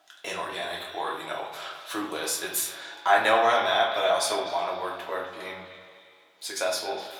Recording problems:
echo of what is said; strong; throughout; 250 ms later, 10 dB below the speech
off-mic speech; far
thin; very; fading below 750 Hz
room echo; slight; dies away in 0.6 s

